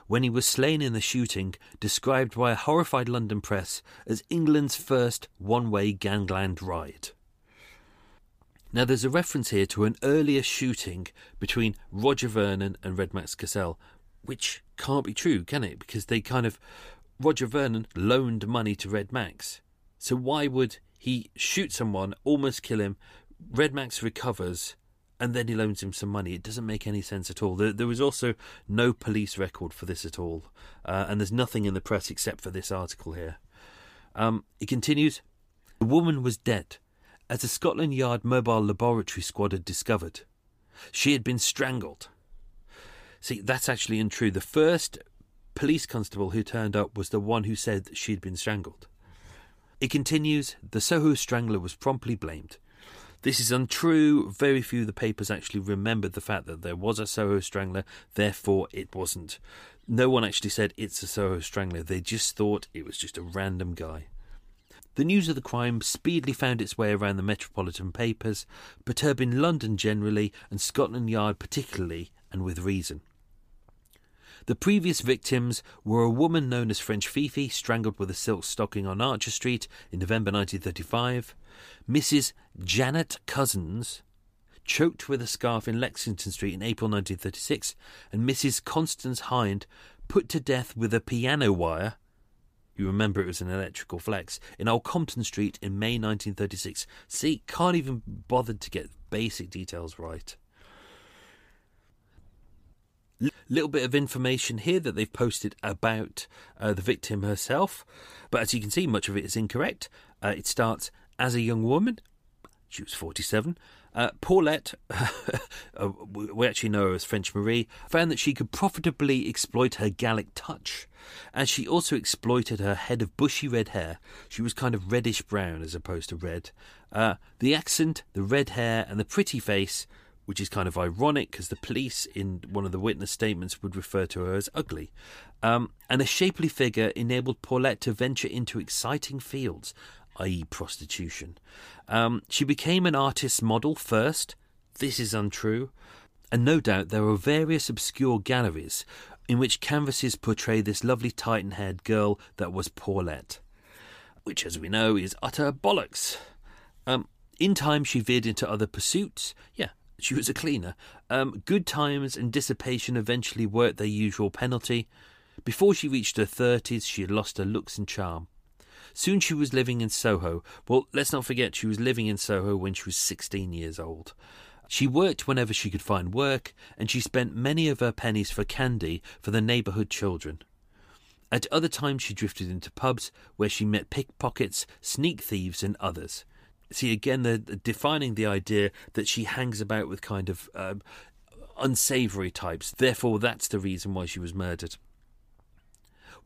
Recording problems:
none

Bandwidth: 15 kHz